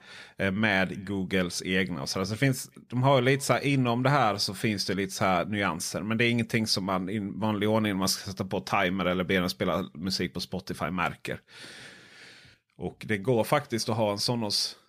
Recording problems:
none

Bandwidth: 15 kHz